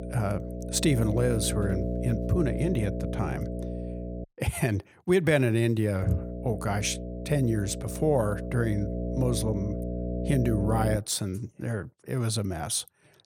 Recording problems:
electrical hum; loud; until 4 s and from 6 to 11 s; 60 Hz, 7 dB below the speech
household noises; faint; until 3 s; 25 dB below the speech

